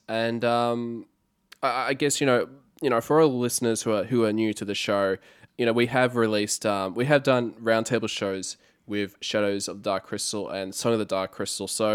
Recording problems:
abrupt cut into speech; at the end

